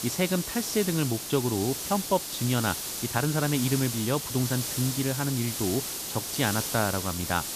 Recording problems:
hiss; loud; throughout; 3 dB below the speech

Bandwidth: 14.5 kHz